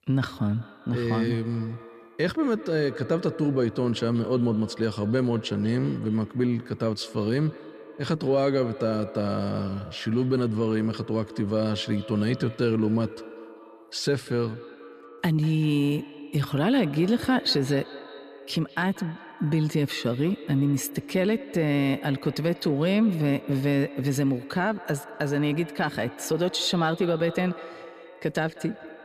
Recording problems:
echo of what is said; noticeable; throughout; 190 ms later, 15 dB below the speech

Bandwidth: 14.5 kHz